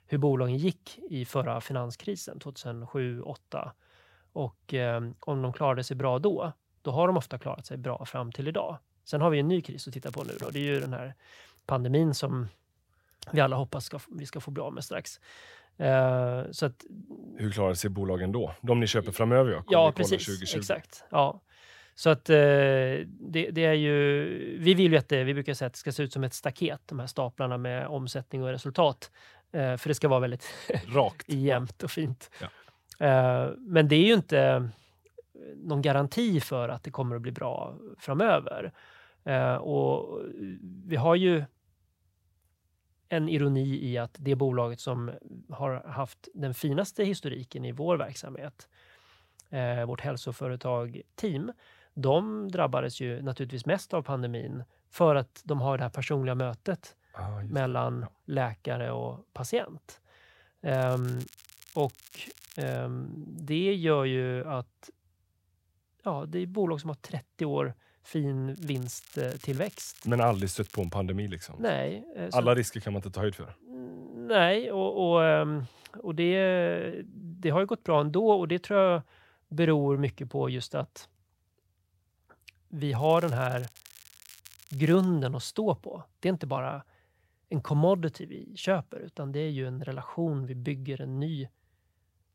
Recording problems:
crackling; faint; 4 times, first at 10 s; 25 dB below the speech

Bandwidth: 16 kHz